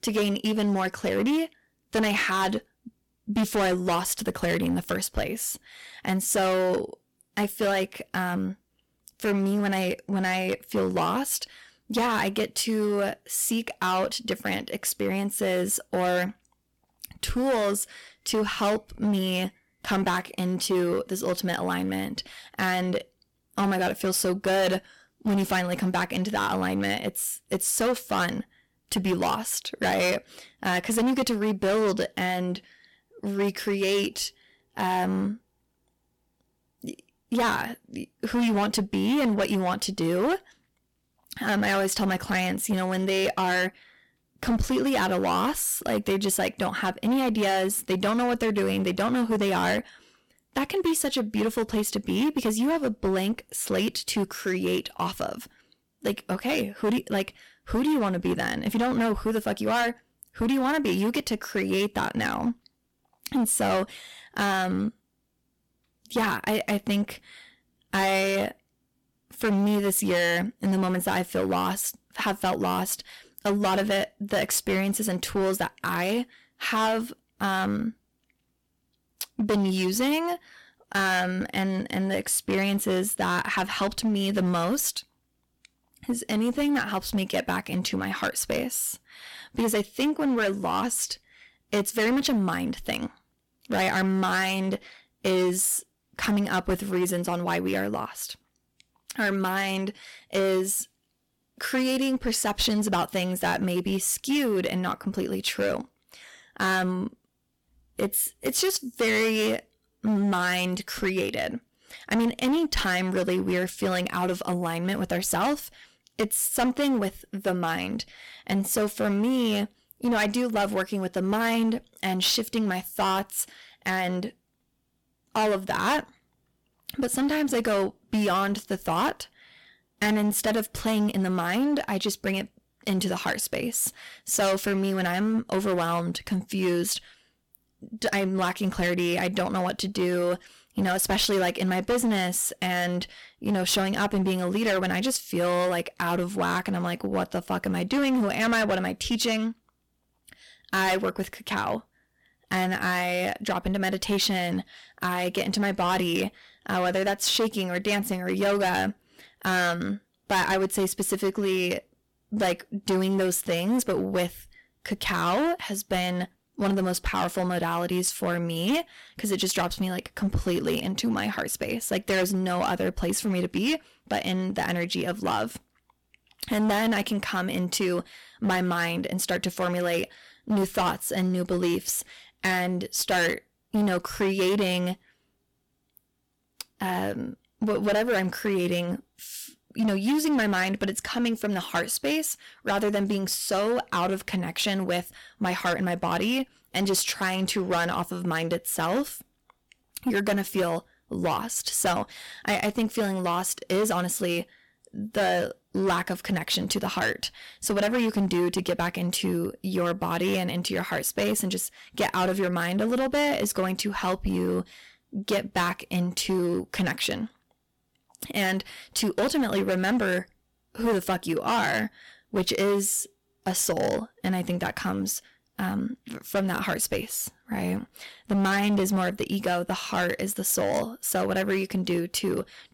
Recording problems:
distortion; heavy; 11% of the sound clipped

